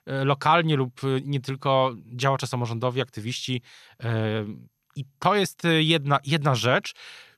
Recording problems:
none

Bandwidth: 13.5 kHz